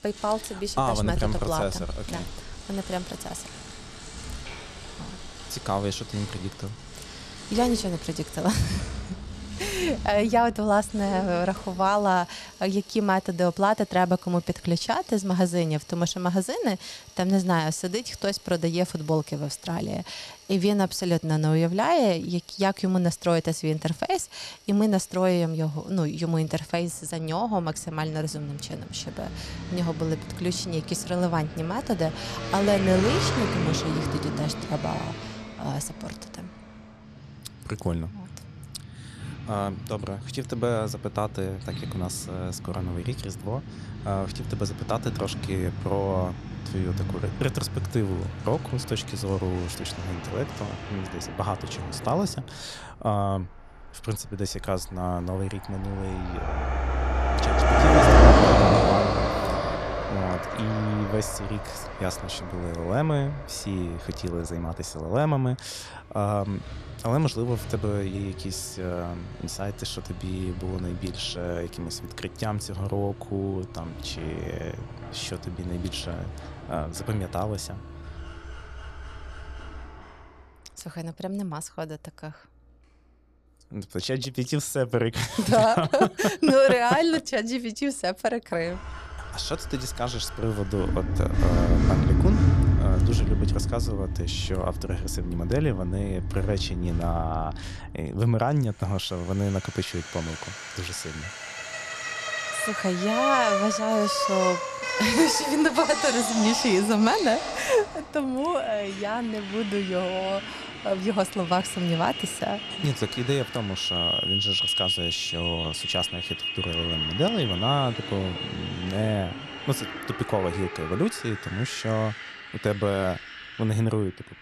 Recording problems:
traffic noise; loud; throughout; 1 dB below the speech

